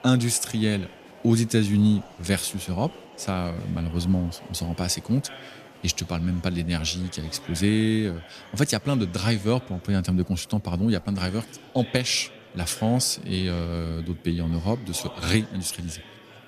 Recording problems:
murmuring crowd; noticeable; throughout; 20 dB below the speech

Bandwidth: 14.5 kHz